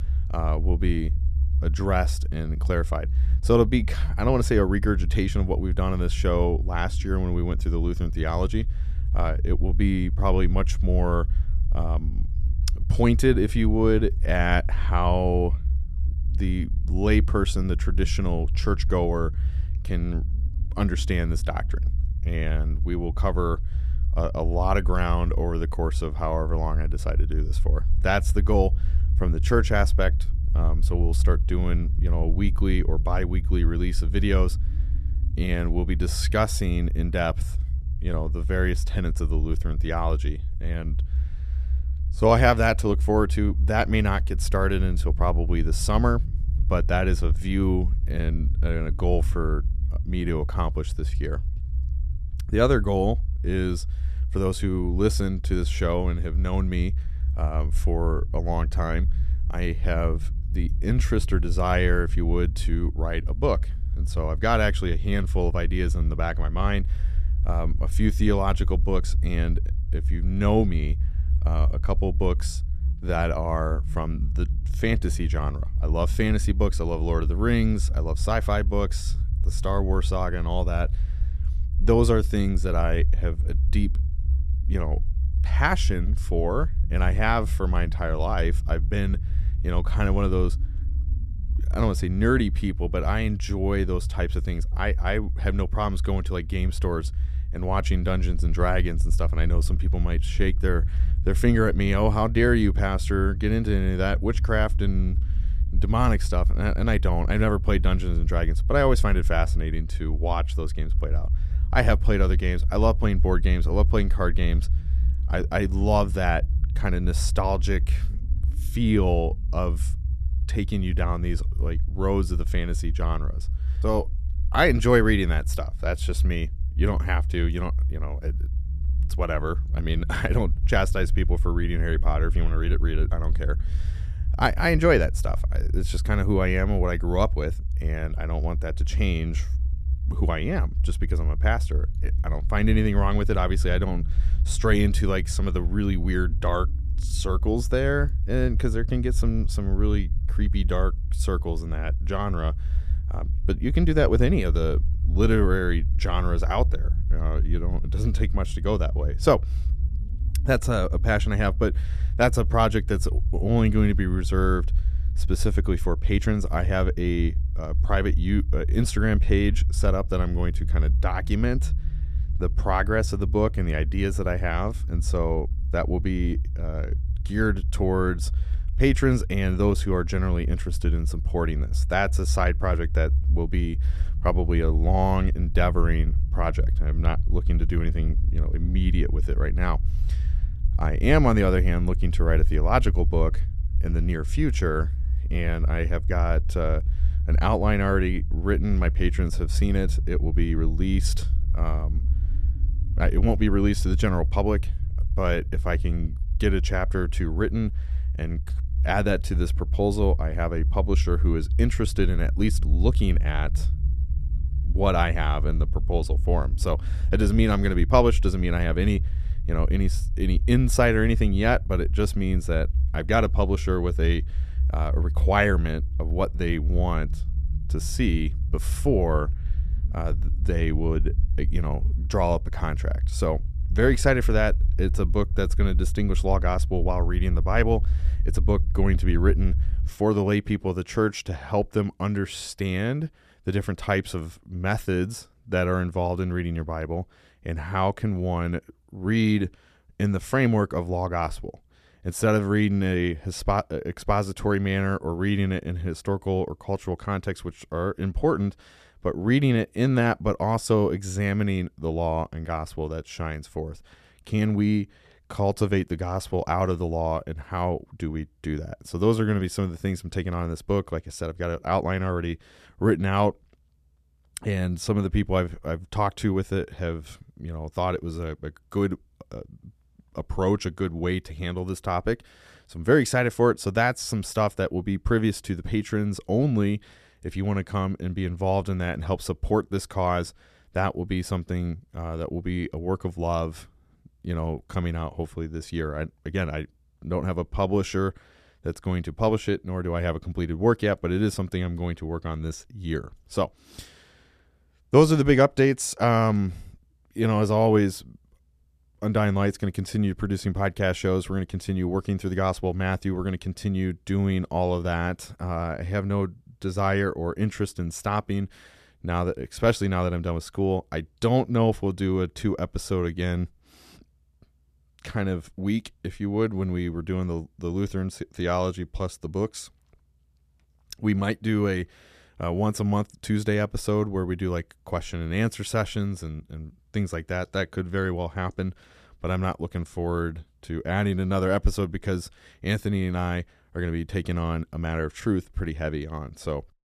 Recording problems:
low rumble; noticeable; until 4:00; 20 dB below the speech

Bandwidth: 14.5 kHz